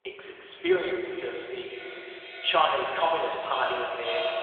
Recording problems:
echo of what is said; strong; throughout; 520 ms later, 8 dB below the speech
thin; very; fading below 400 Hz
room echo; noticeable; dies away in 1.8 s
phone-call audio; nothing above 3.5 kHz
off-mic speech; somewhat distant
background chatter; faint; throughout; 3 voices, 25 dB below the speech

